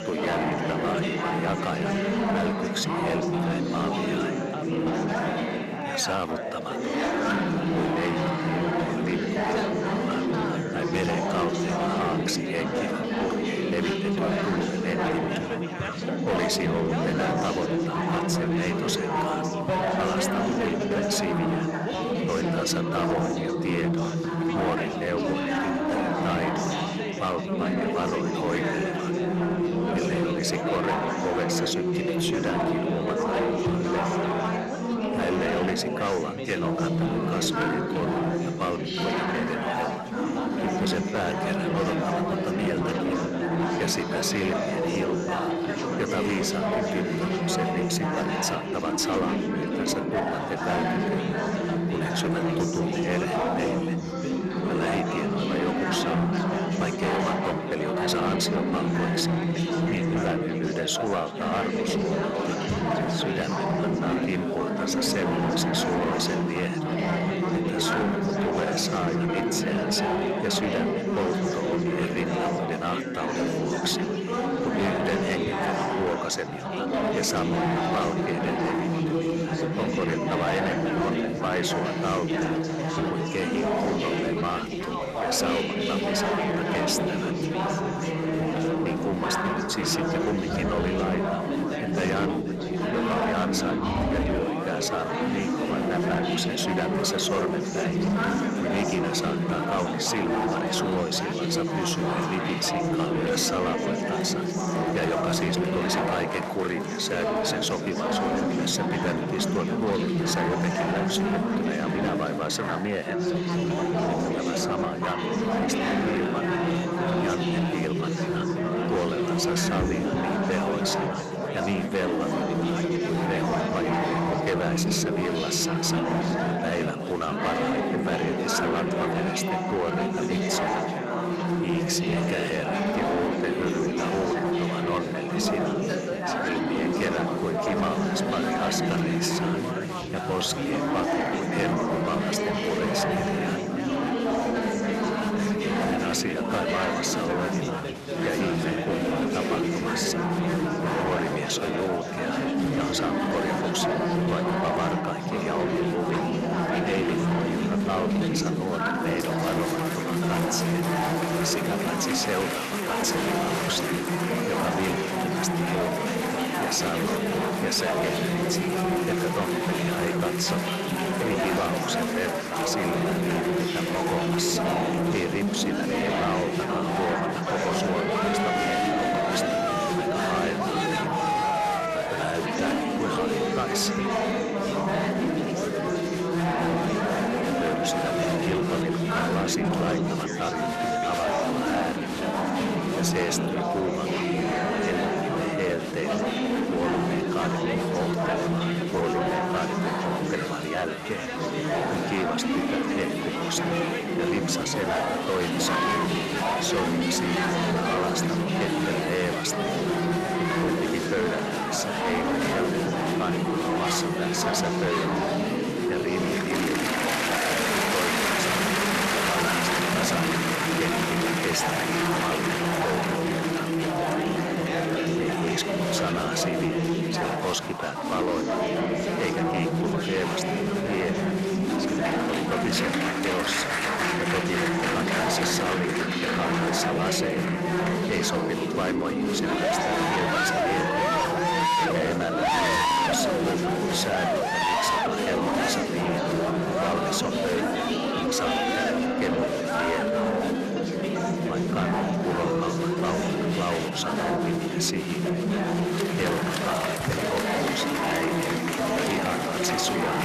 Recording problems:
distortion; slight; 16% of the sound clipped
chatter from many people; very loud; throughout; 4 dB above the speech

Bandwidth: 13.5 kHz